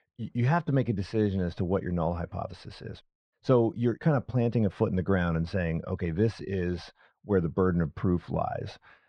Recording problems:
muffled; very; fading above 2 kHz

